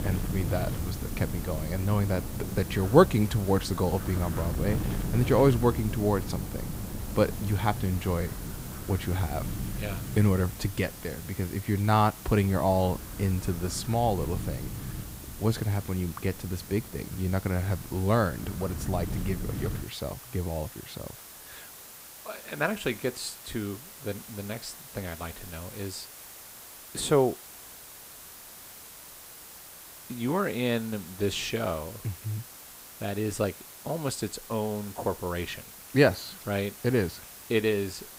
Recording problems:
wind noise on the microphone; occasional gusts; until 20 s; 15 dB below the speech
hiss; noticeable; throughout; 15 dB below the speech

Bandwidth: 15.5 kHz